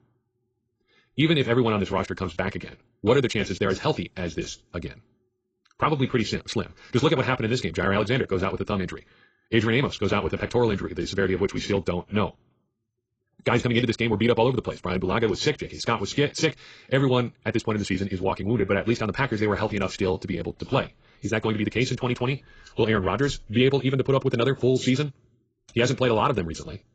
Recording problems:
garbled, watery; badly; nothing above 7.5 kHz
wrong speed, natural pitch; too fast; 1.7 times normal speed

